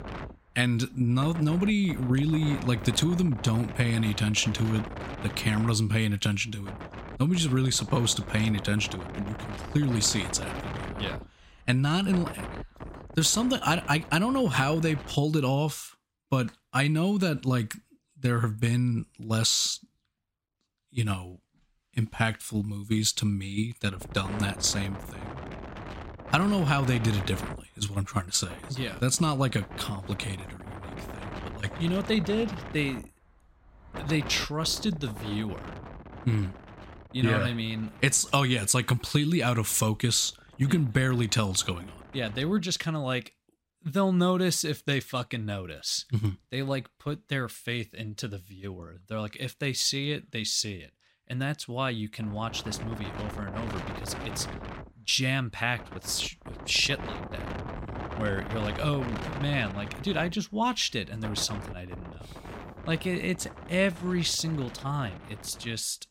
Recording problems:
wind noise on the microphone; occasional gusts; until 15 s, from 24 to 43 s and from 52 s on; 10 dB below the speech

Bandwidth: 16 kHz